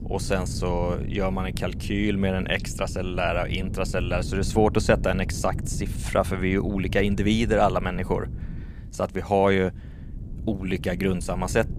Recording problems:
wind noise on the microphone; occasional gusts; 20 dB below the speech

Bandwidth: 15 kHz